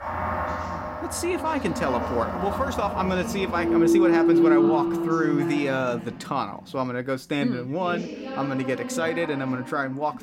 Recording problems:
background music; very loud; until 5.5 s; 3 dB above the speech
background chatter; loud; throughout; 2 voices, 8 dB below the speech

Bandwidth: 16 kHz